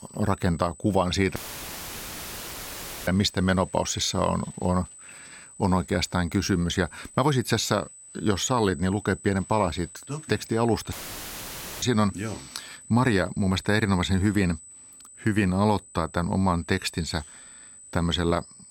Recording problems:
high-pitched whine; noticeable; throughout; 8 kHz, 20 dB below the speech
audio cutting out; filled with static; at 1.5 s for 1.5 s and at 11 s for 1 s

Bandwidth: 16.5 kHz